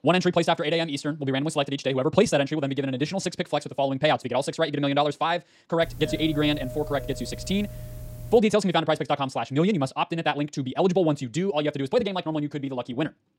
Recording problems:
wrong speed, natural pitch; too fast; 1.8 times normal speed
doorbell; faint; from 6 to 8.5 s; peak 10 dB below the speech

